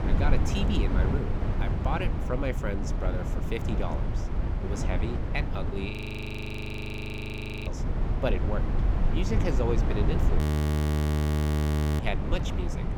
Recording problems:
low rumble; loud; throughout; 1 dB below the speech
audio freezing; at 6 s for 2 s and at 10 s for 1.5 s

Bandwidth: 18 kHz